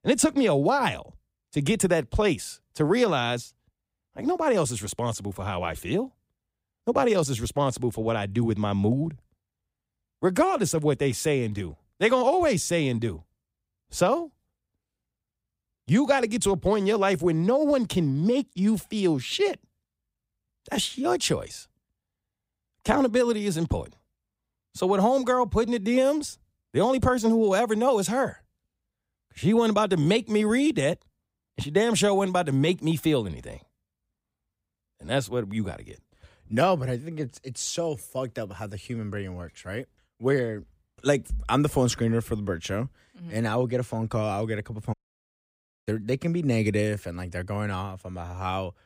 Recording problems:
audio cutting out; at 45 s for 1 s

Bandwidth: 15.5 kHz